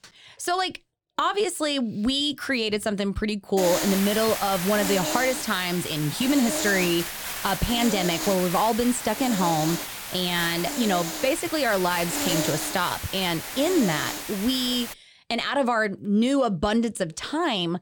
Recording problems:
hiss; loud; from 3.5 to 15 s; 5 dB below the speech

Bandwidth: 18 kHz